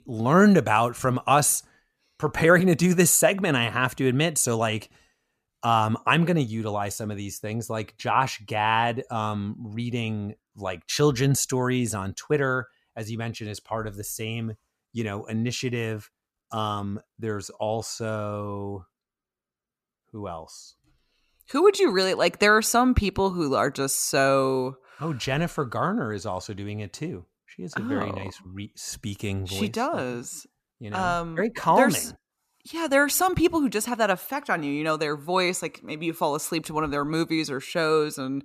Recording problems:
none

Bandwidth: 14.5 kHz